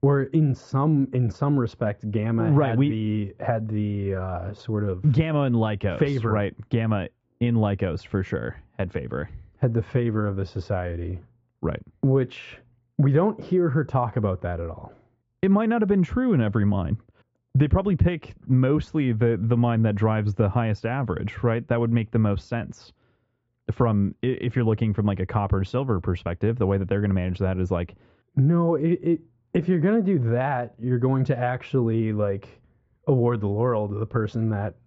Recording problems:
high frequencies cut off; noticeable; nothing above 8 kHz
muffled; very slightly; fading above 3 kHz

